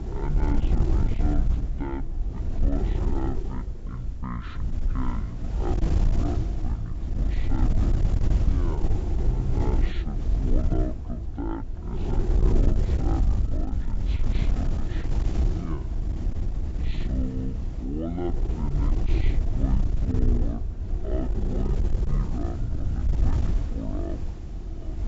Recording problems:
wrong speed and pitch; too slow and too low; 0.5 times normal speed
high frequencies cut off; slight; nothing above 8 kHz
wind noise on the microphone; heavy; 1 dB below the speech

